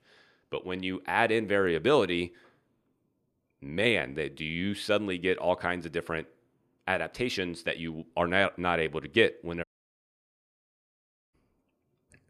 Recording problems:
audio cutting out; at 9.5 s for 1.5 s

